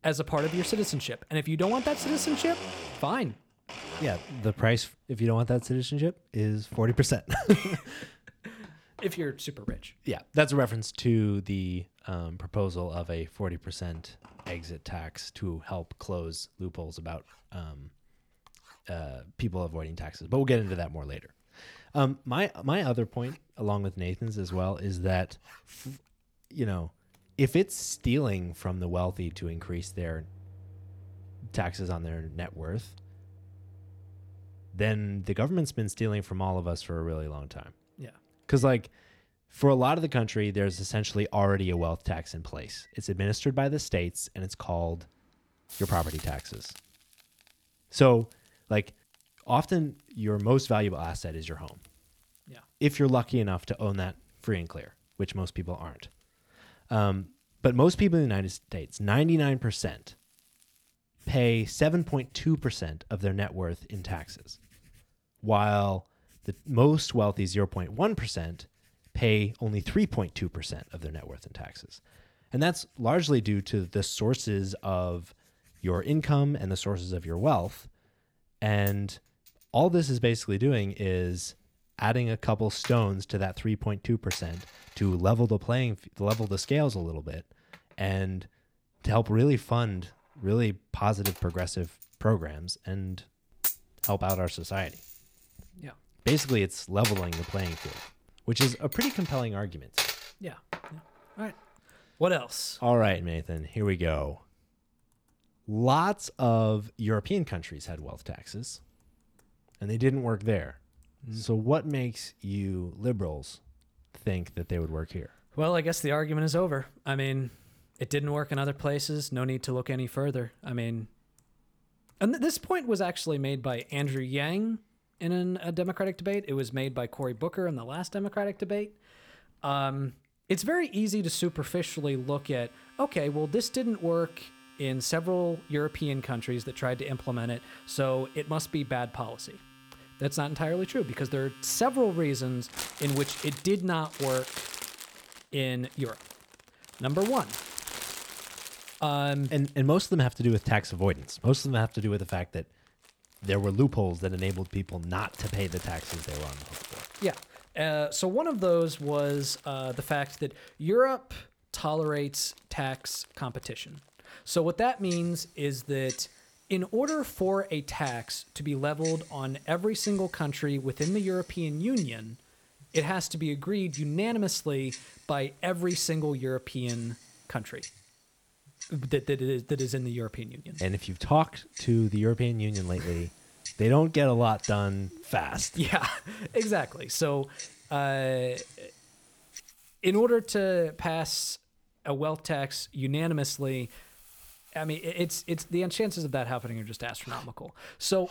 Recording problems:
household noises; noticeable; throughout; 10 dB below the speech

